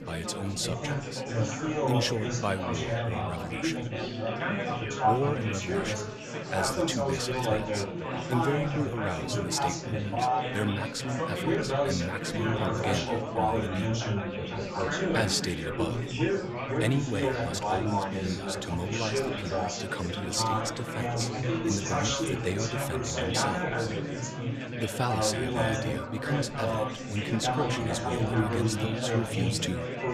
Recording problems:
chatter from many people; very loud; throughout; 3 dB above the speech

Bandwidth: 14.5 kHz